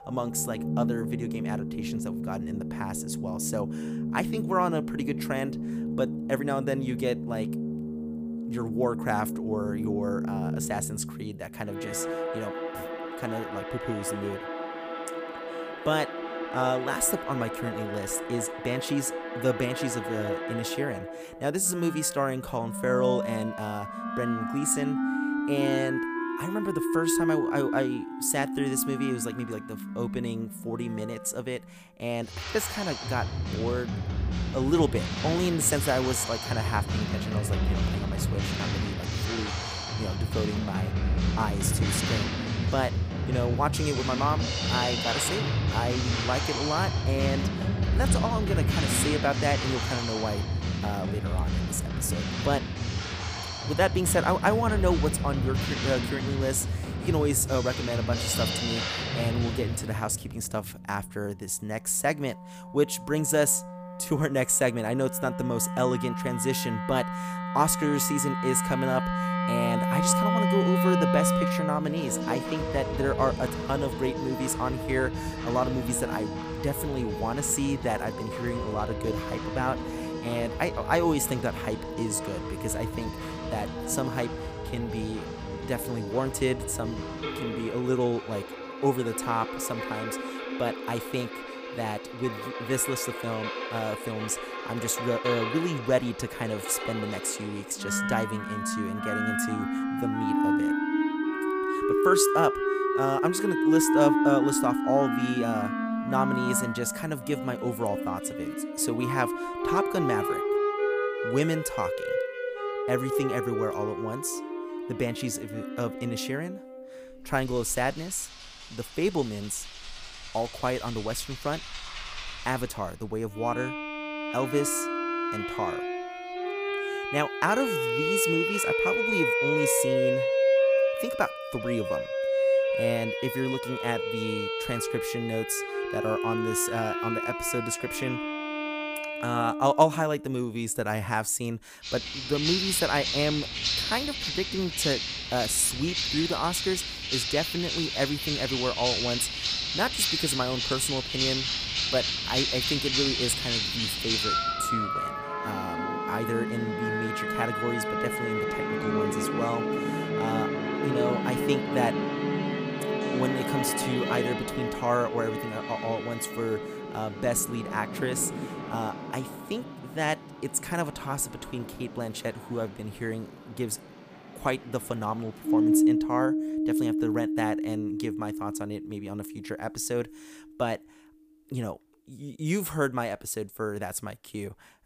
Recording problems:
background music; very loud; throughout; as loud as the speech

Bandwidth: 15 kHz